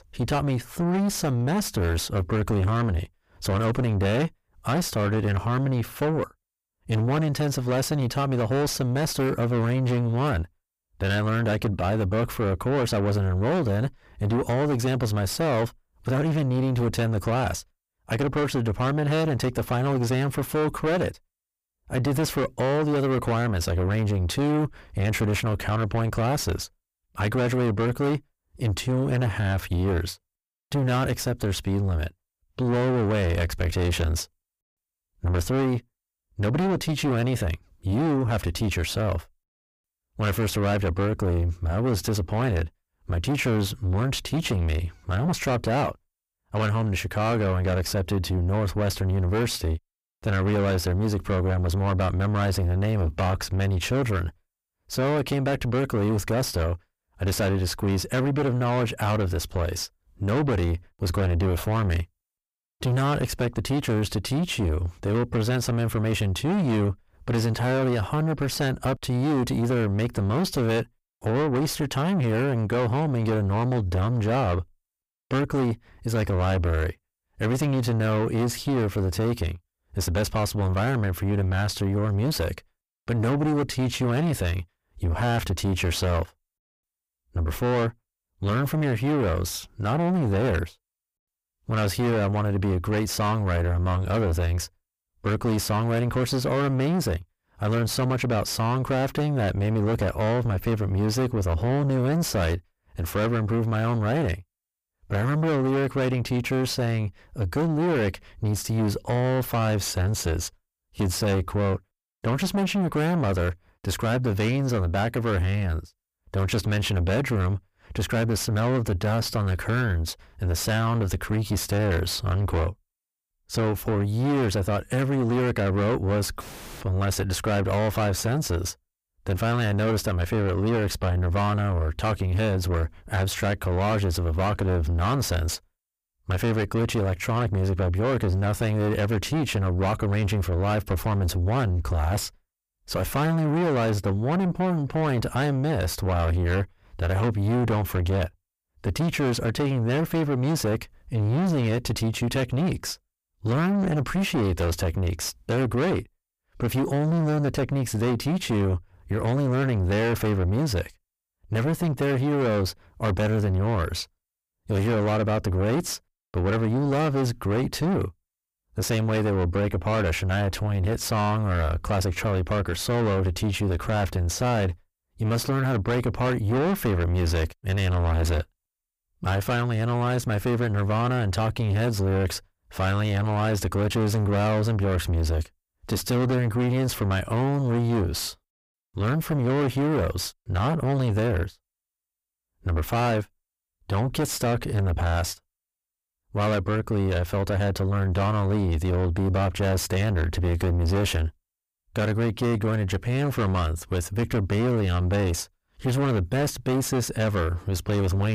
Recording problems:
distortion; heavy; 6 dB below the speech
abrupt cut into speech; at the end

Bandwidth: 15 kHz